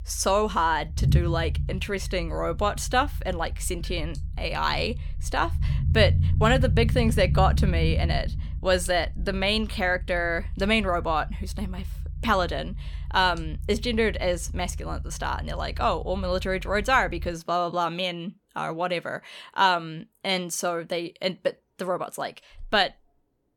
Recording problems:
low rumble; noticeable; until 17 s; 20 dB below the speech

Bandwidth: 17.5 kHz